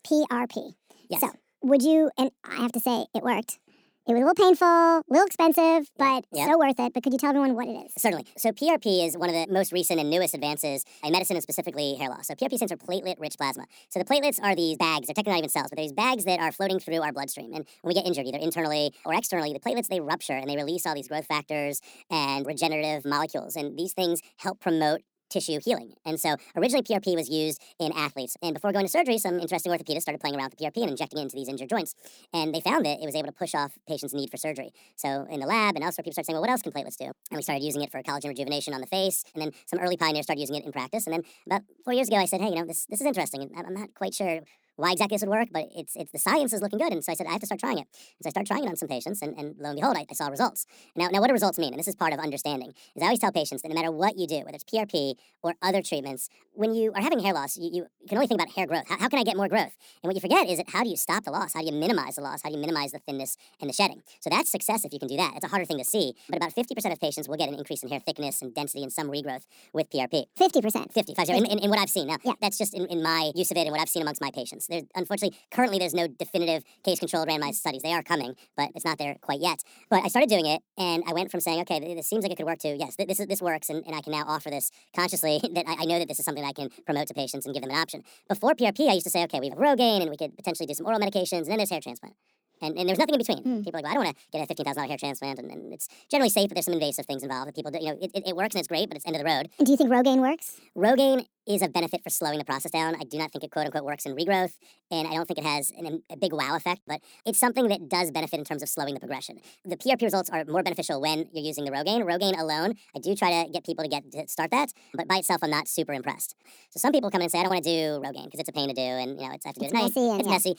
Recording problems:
wrong speed and pitch; too fast and too high; 1.5 times normal speed

